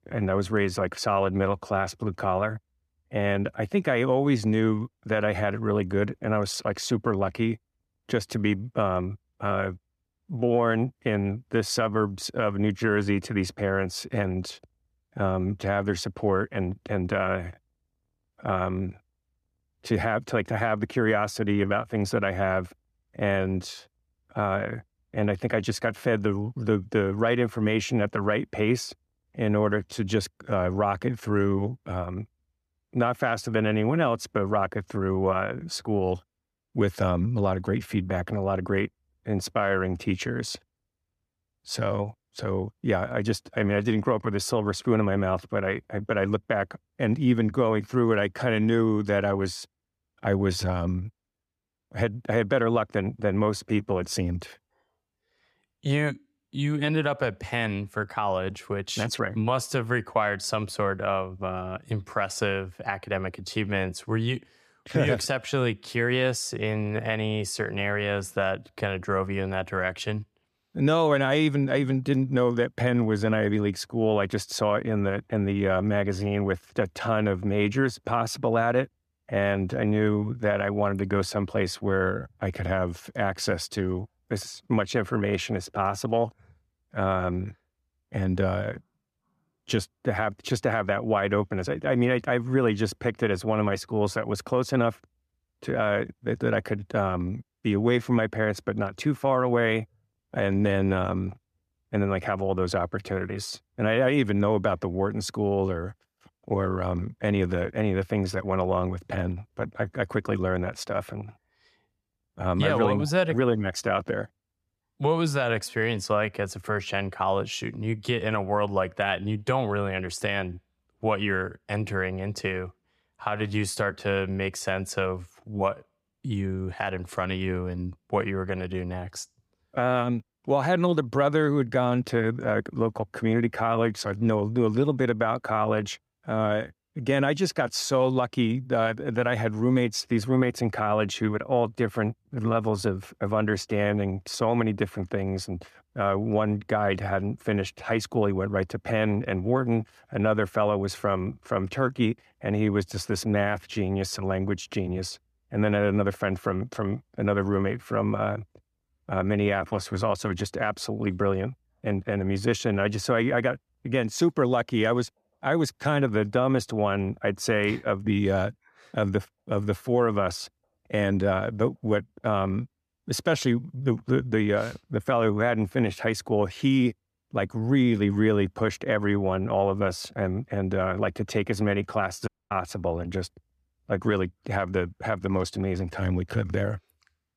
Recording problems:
audio cutting out; at 3:02

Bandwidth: 14.5 kHz